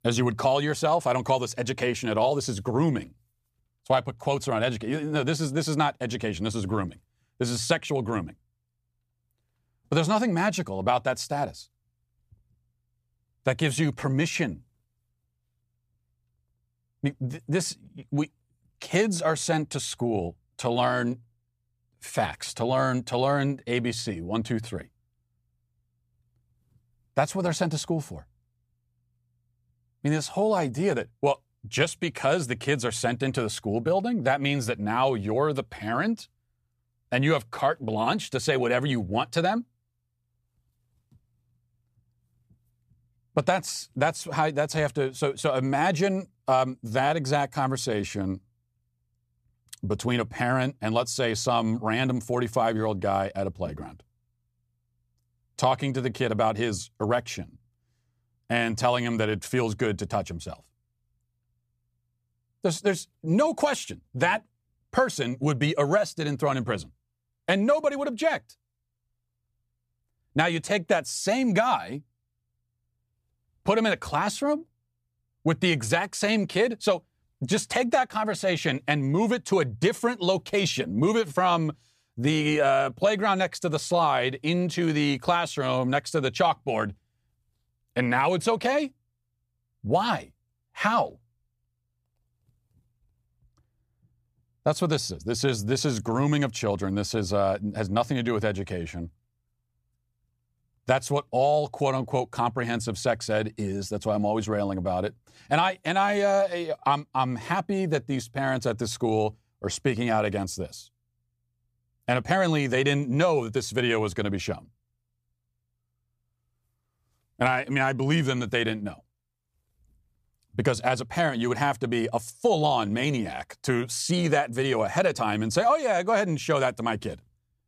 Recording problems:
none

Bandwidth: 15 kHz